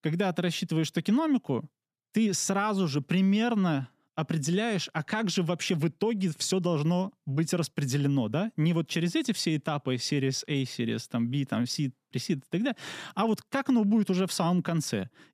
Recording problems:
none

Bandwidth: 14.5 kHz